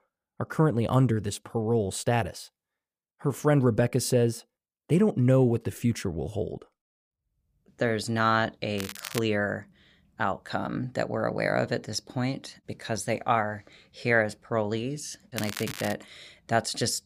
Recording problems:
crackling; noticeable; at 9 s and at 15 s; 10 dB below the speech

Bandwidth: 15 kHz